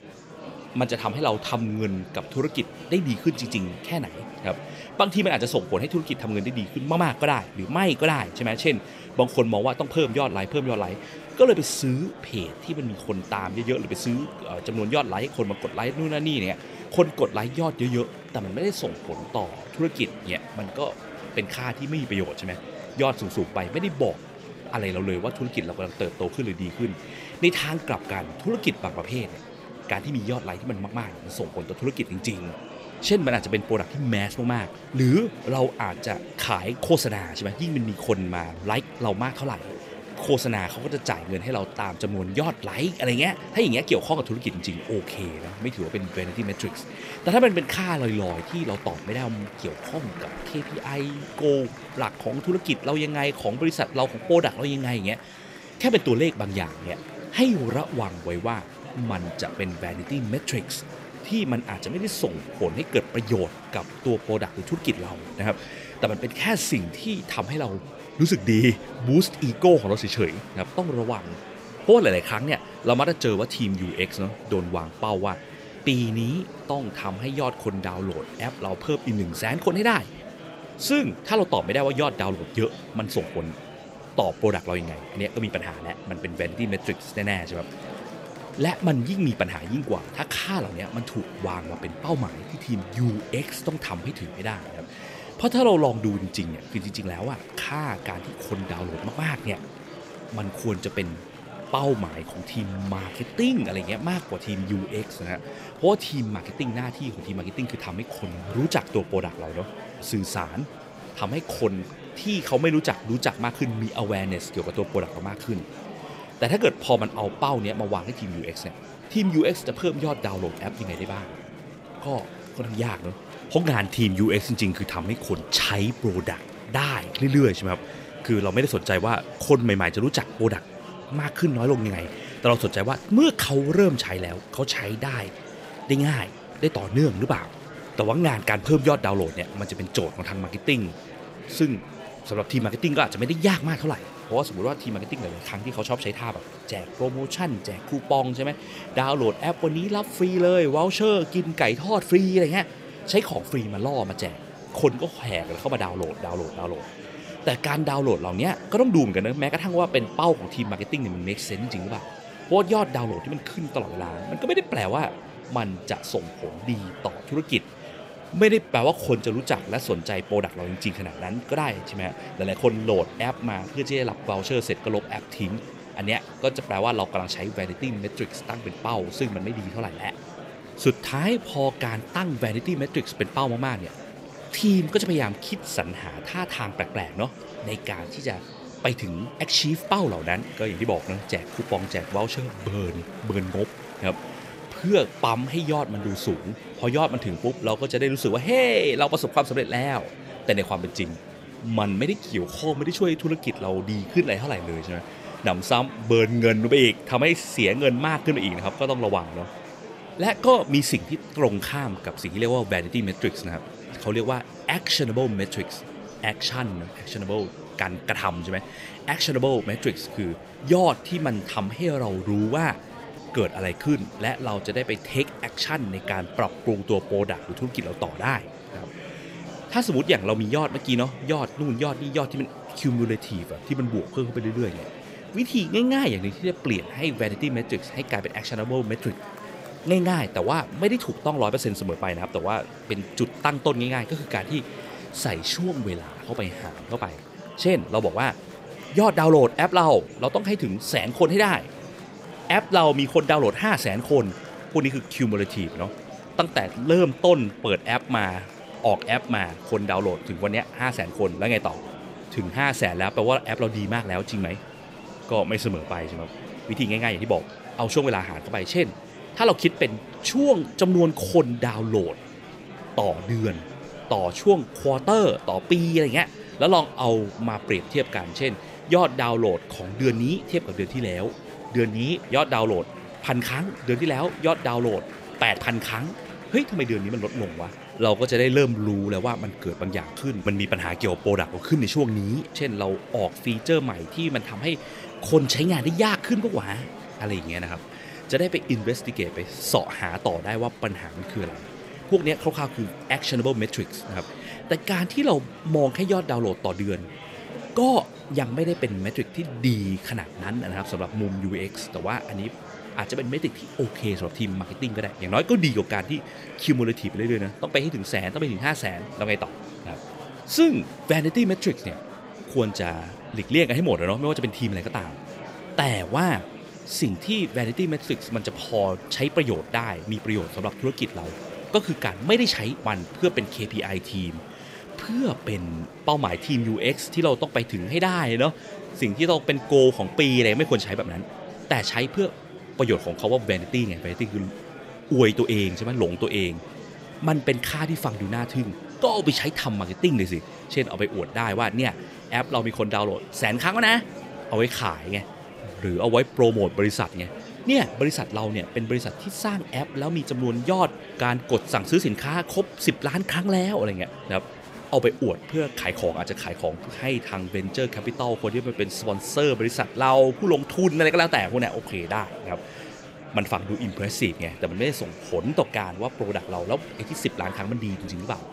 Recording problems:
murmuring crowd; noticeable; throughout; 15 dB below the speech

